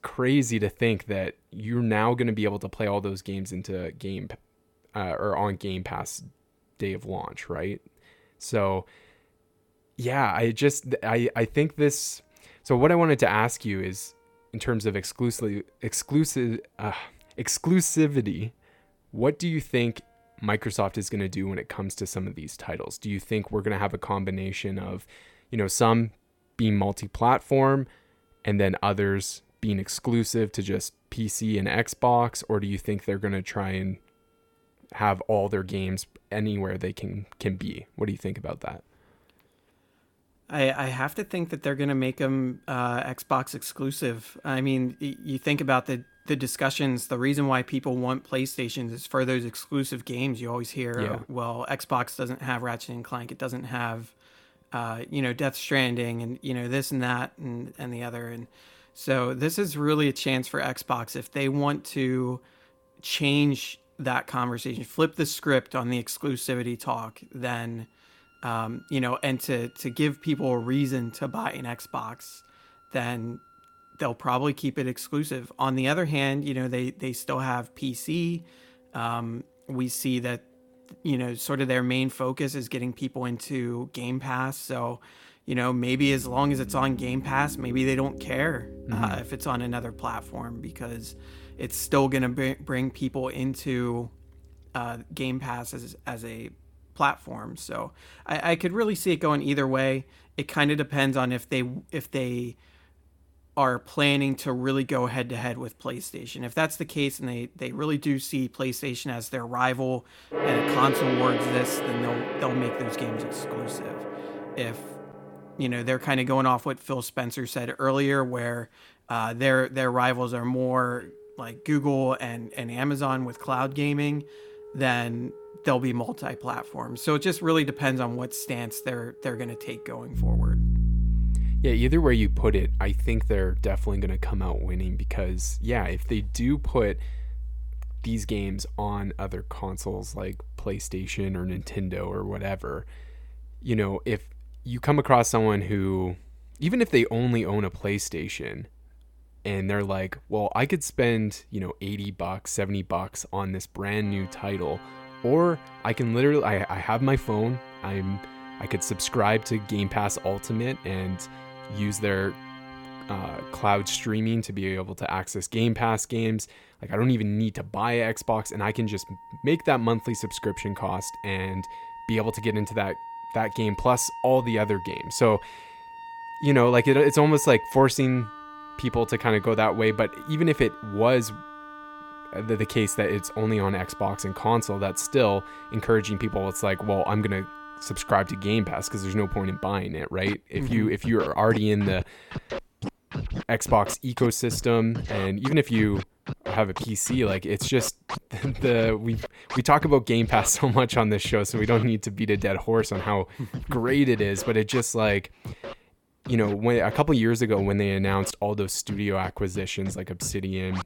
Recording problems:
background music; loud; throughout; 9 dB below the speech

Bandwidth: 17.5 kHz